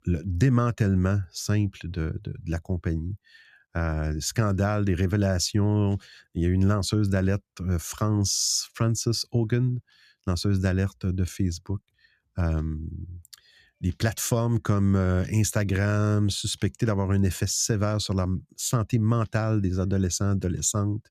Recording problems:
none

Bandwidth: 14.5 kHz